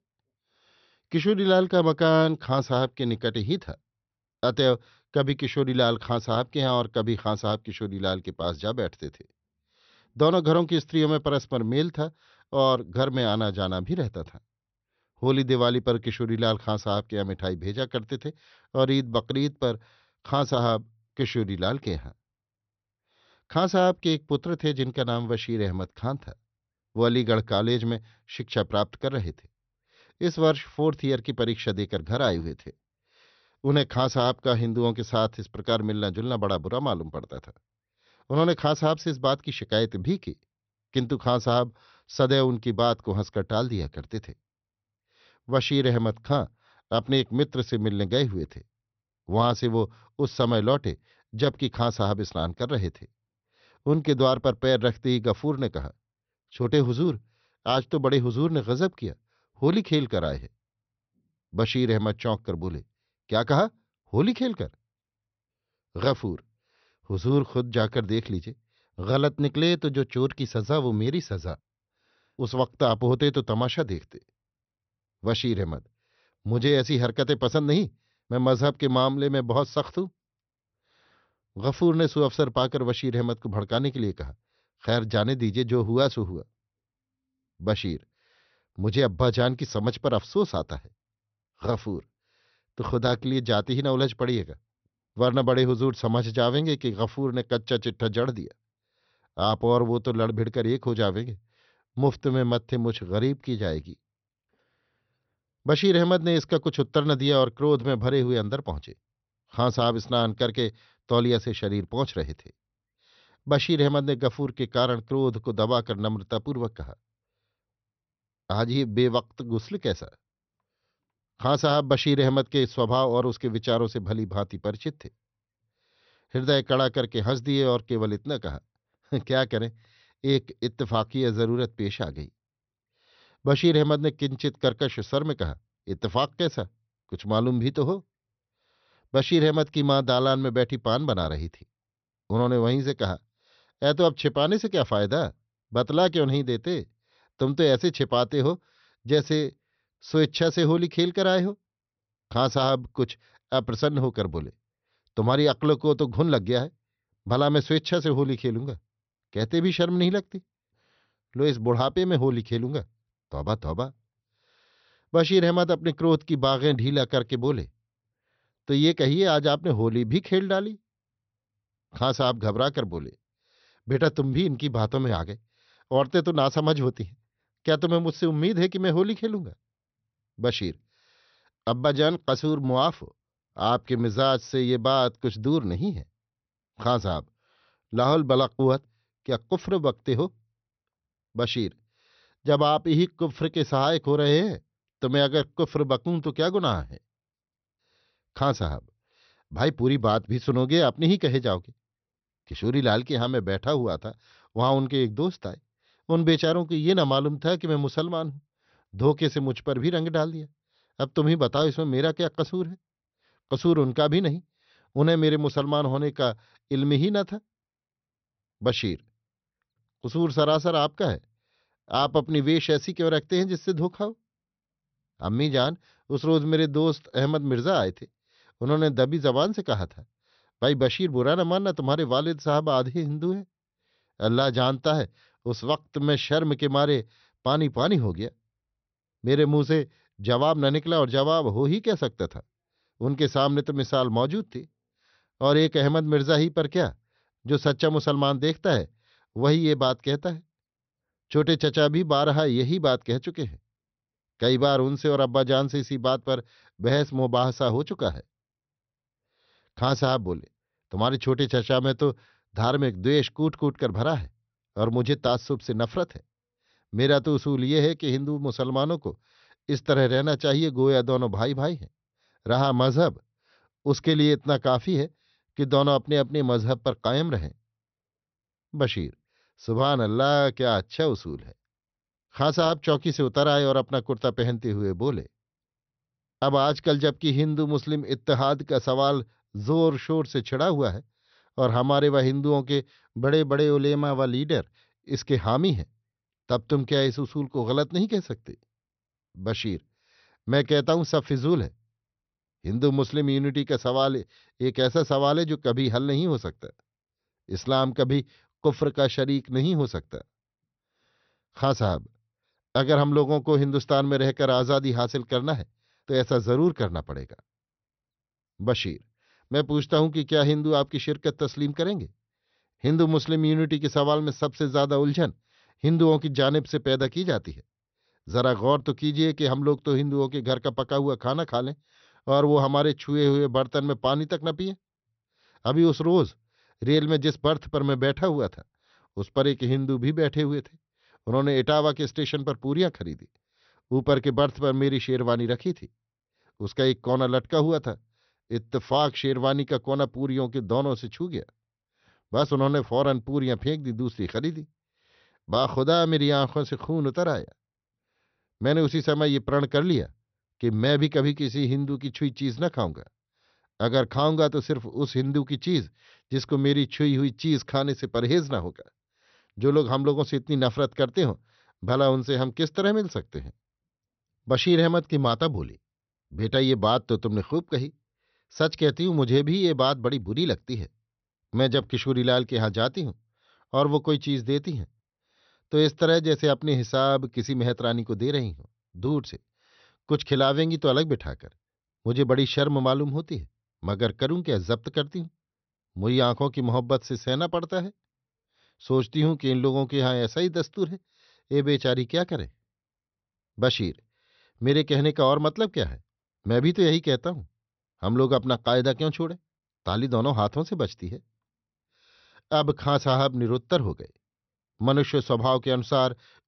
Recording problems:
high frequencies cut off; noticeable; nothing above 6 kHz

